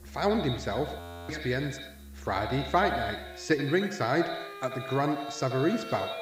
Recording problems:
echo of what is said; strong; throughout; 80 ms later, 7 dB below the speech
high frequencies cut off; noticeable; nothing above 8 kHz
background music; noticeable; throughout; 15 dB below the speech
hiss; faint; throughout; 30 dB below the speech
audio freezing; at 1 s

